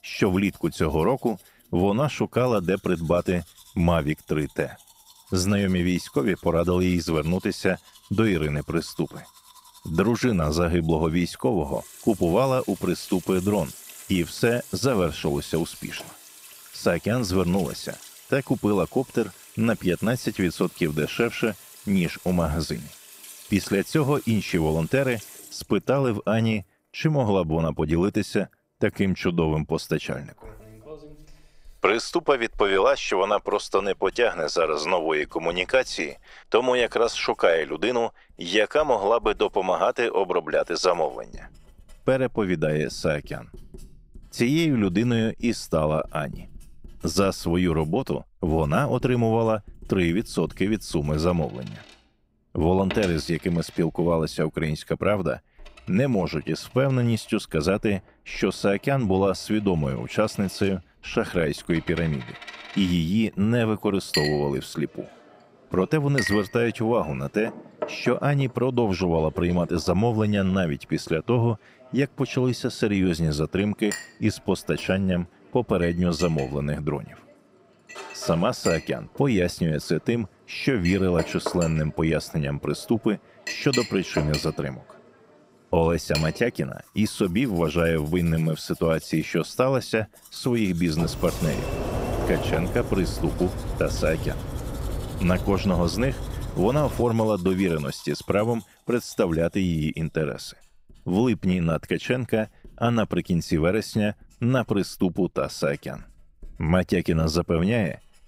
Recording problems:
household noises; noticeable; throughout; 15 dB below the speech
door banging; noticeable; from 1:31 to 1:37; peak 3 dB below the speech

